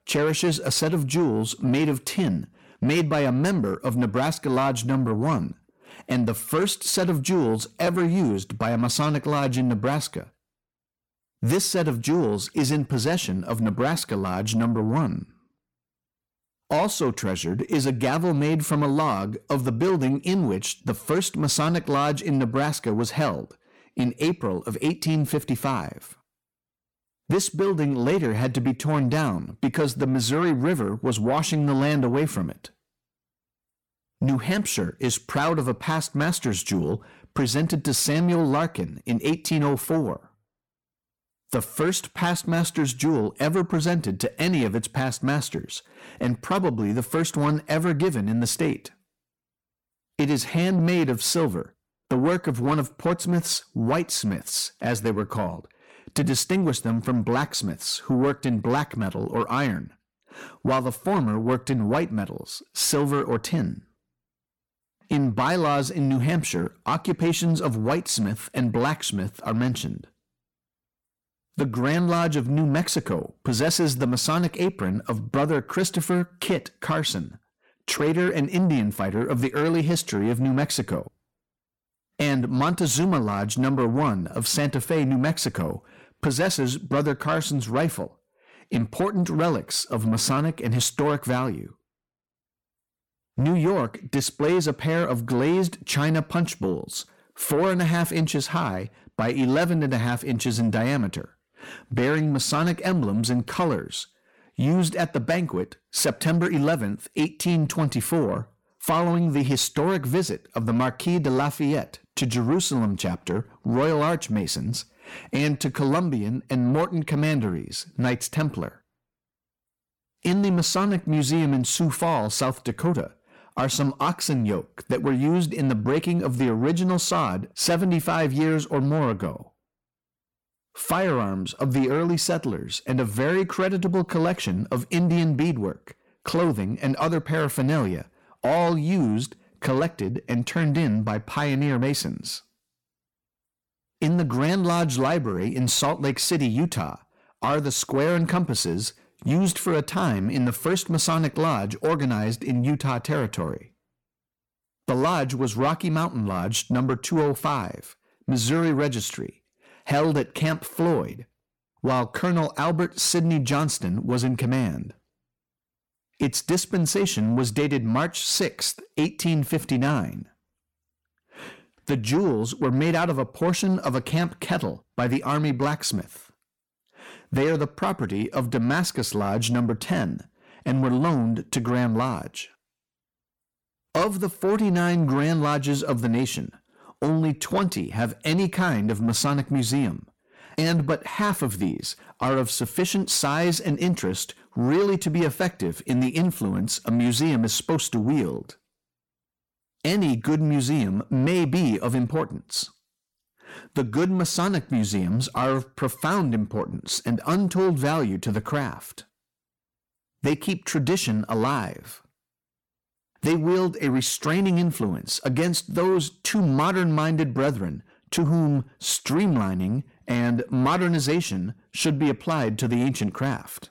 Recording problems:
distortion; slight; 10 dB below the speech

